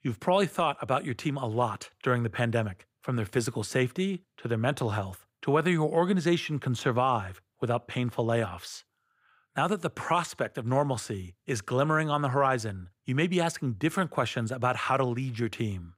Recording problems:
none

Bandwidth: 15.5 kHz